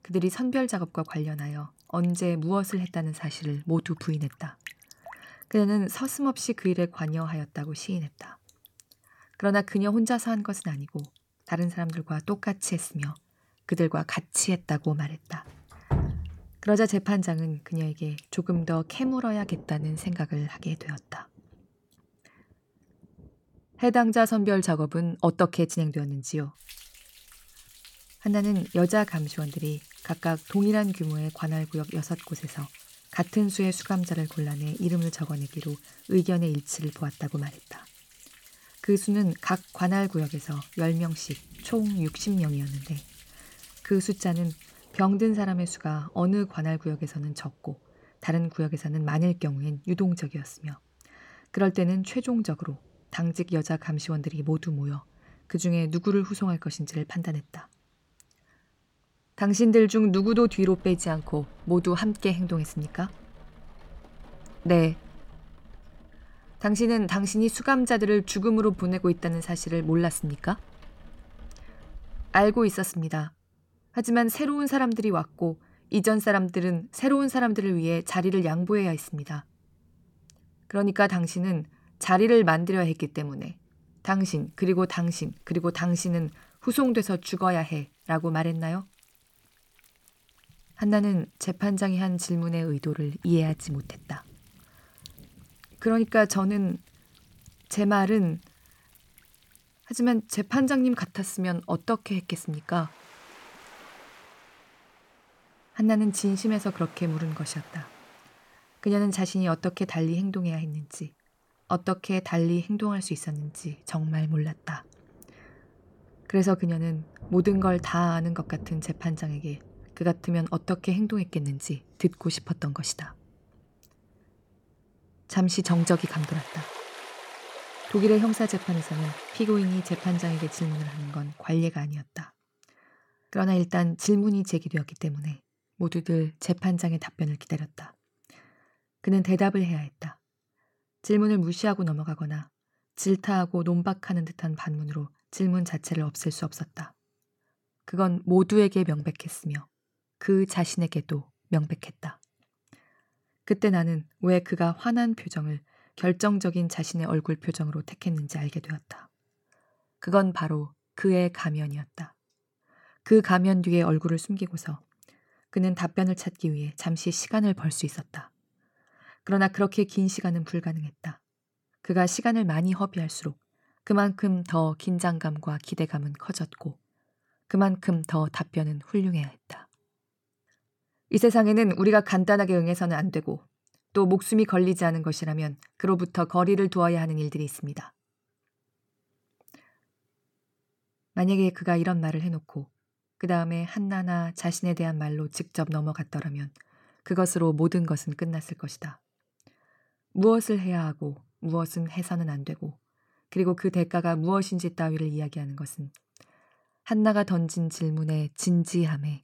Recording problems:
rain or running water; noticeable; until 2:11; 20 dB below the speech

